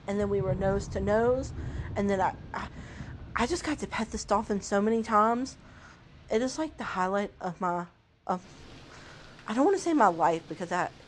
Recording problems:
rain or running water; noticeable; throughout; 15 dB below the speech

